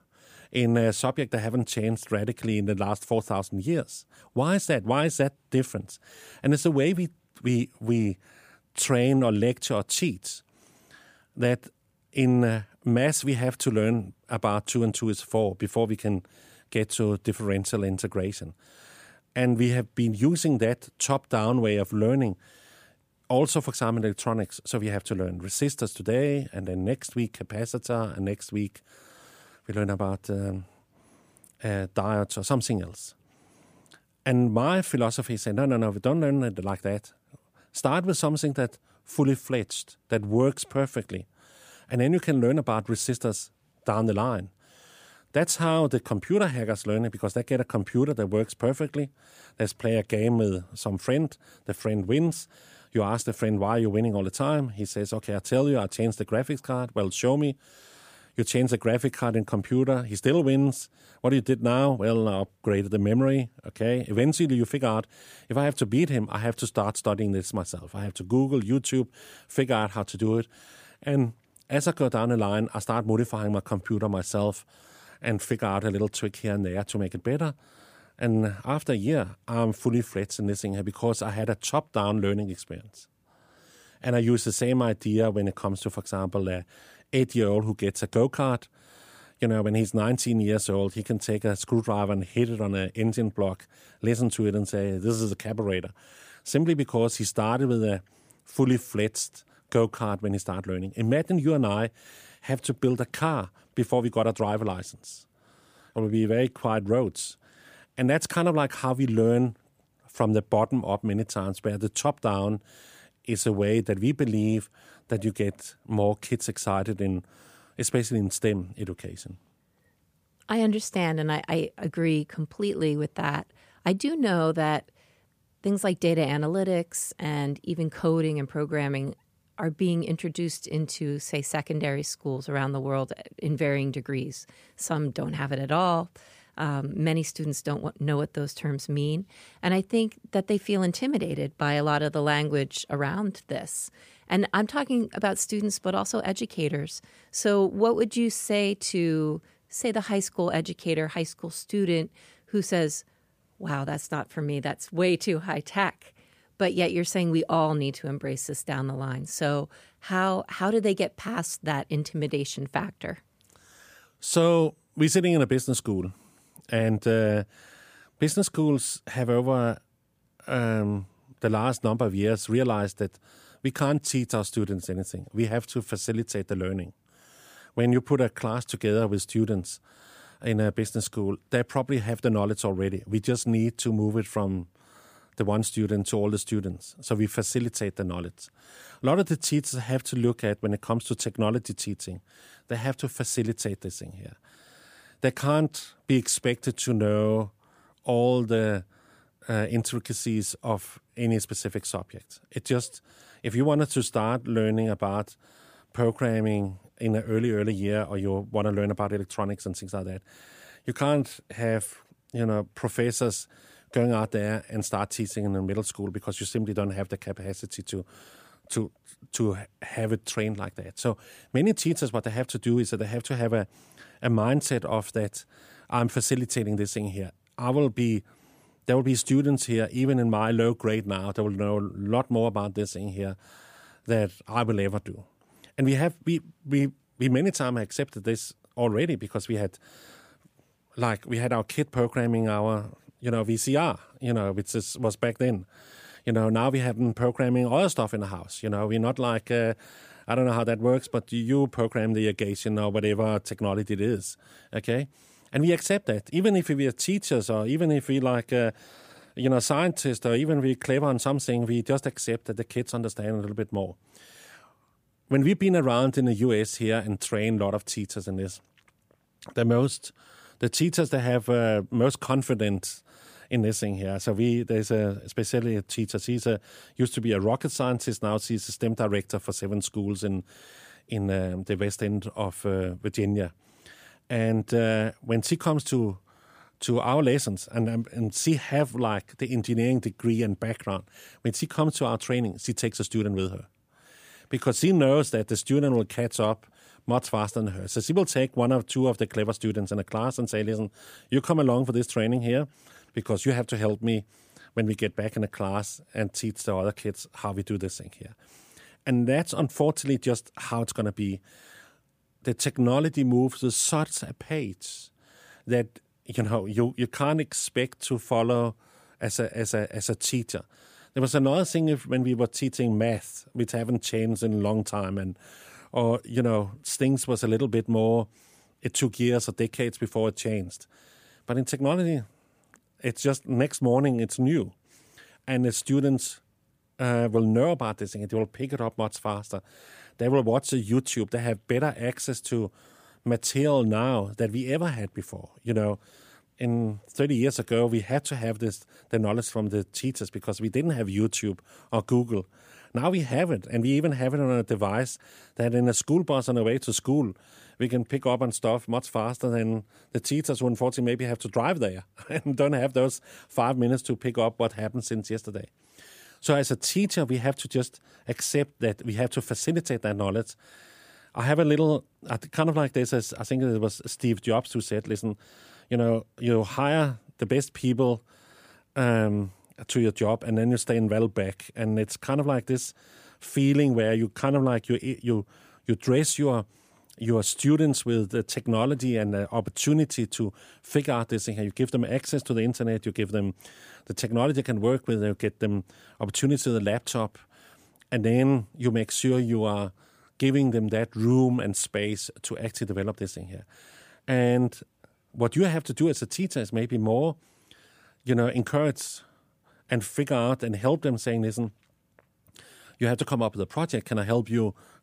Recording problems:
none

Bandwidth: 15 kHz